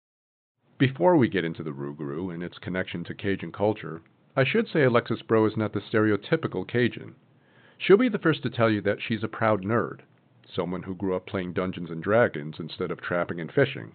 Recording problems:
high frequencies cut off; severe; nothing above 4 kHz

